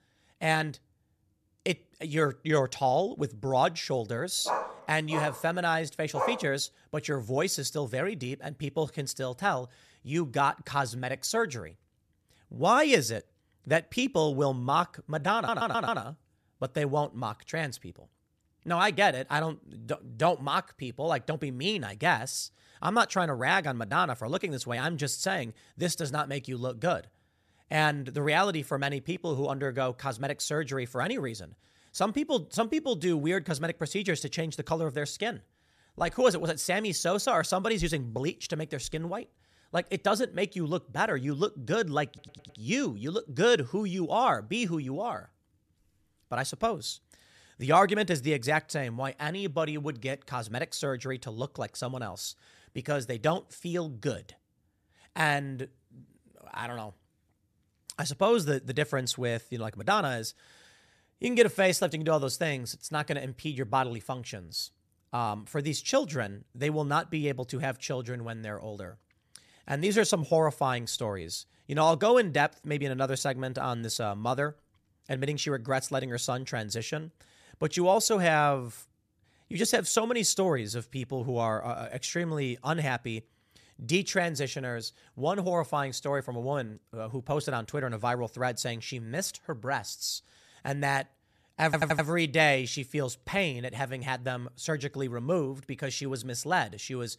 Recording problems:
dog barking; noticeable; from 4.5 to 6.5 s; peak 2 dB below the speech
audio stuttering; at 15 s, at 42 s and at 1:32

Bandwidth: 14 kHz